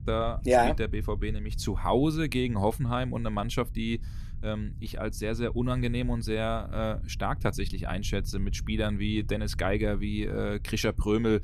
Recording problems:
low rumble; faint; throughout; 25 dB below the speech

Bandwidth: 14.5 kHz